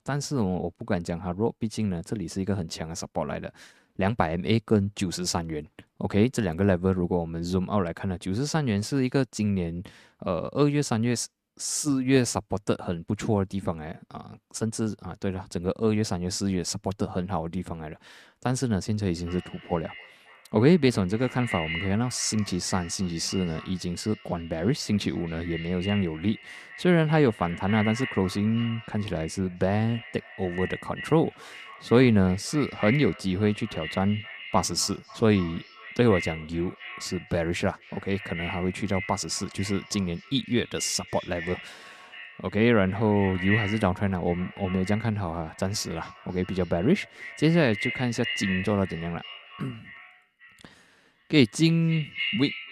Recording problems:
echo of what is said; strong; from 19 s on; 270 ms later, 10 dB below the speech

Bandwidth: 14 kHz